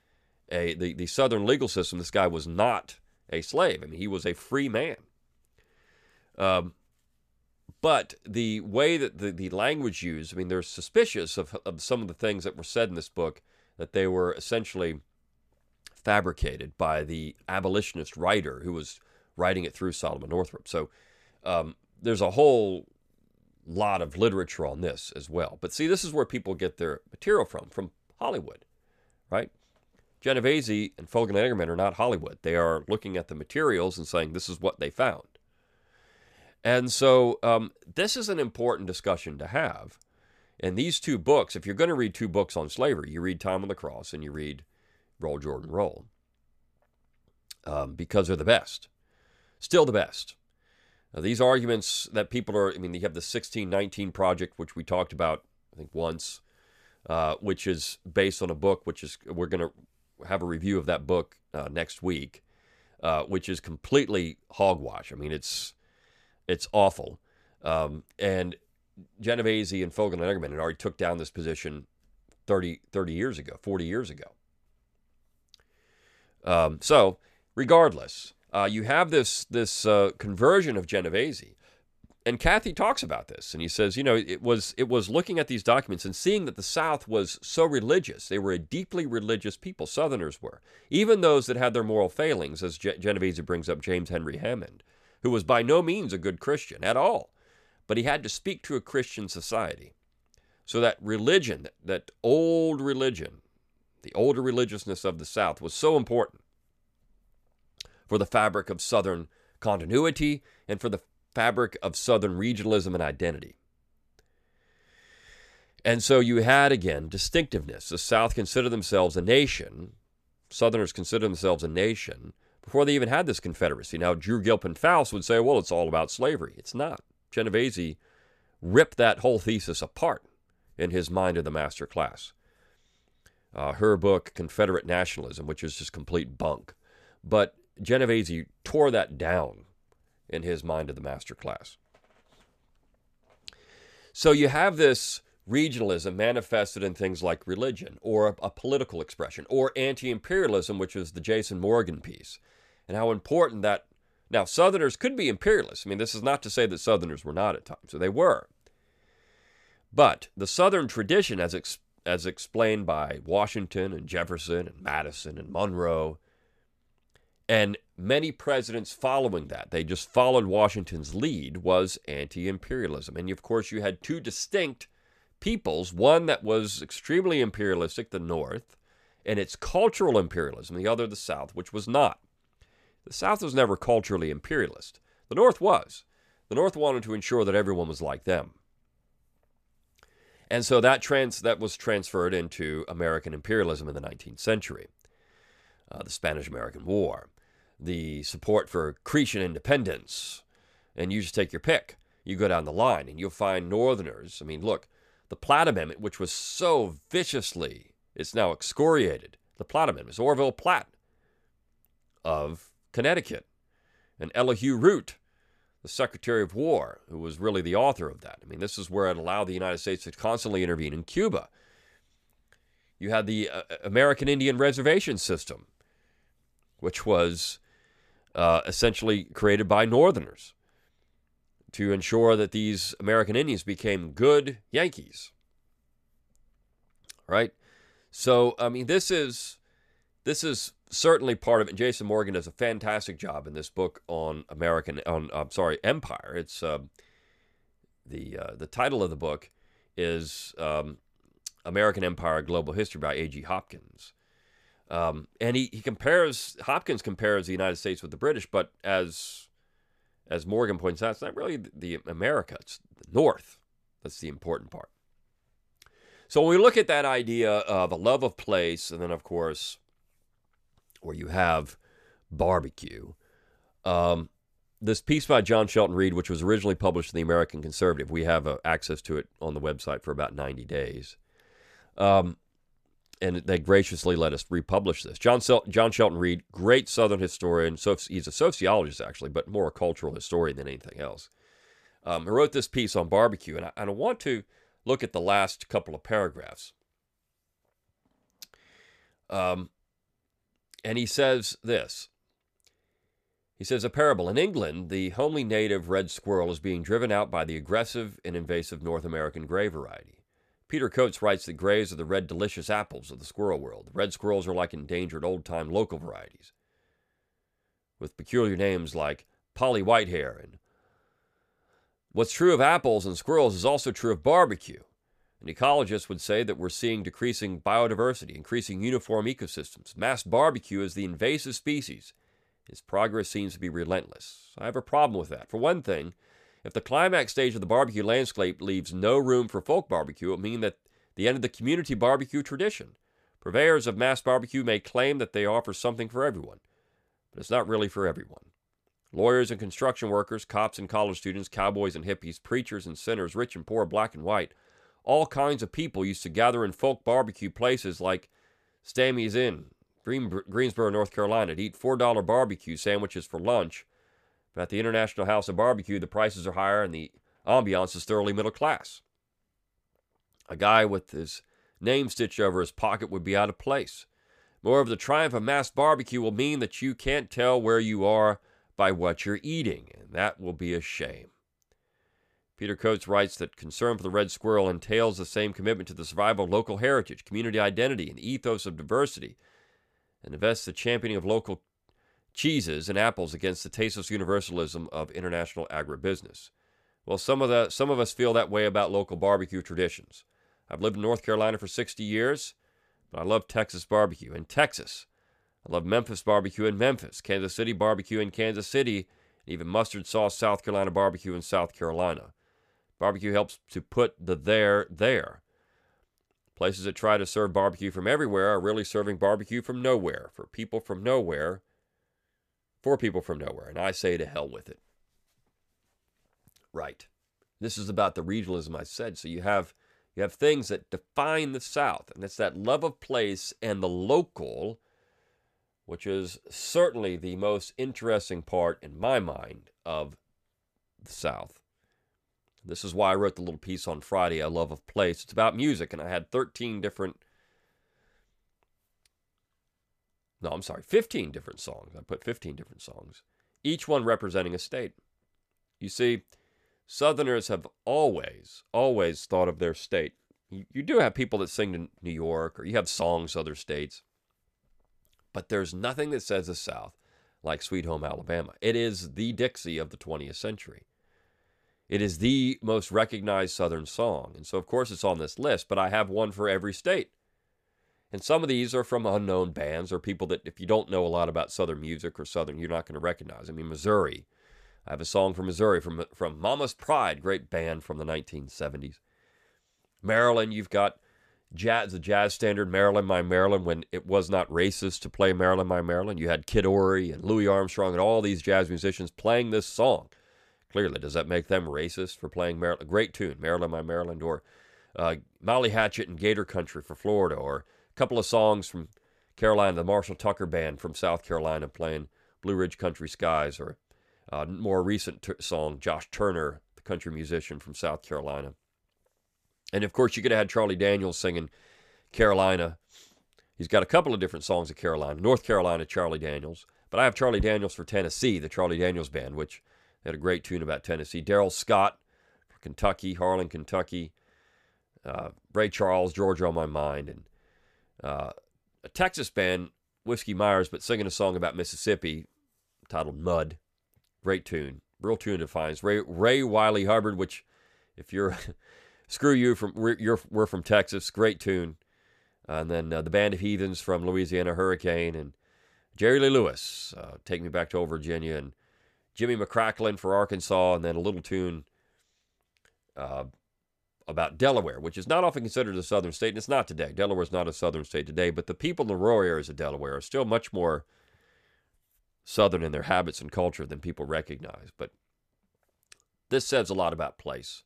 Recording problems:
none

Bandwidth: 14.5 kHz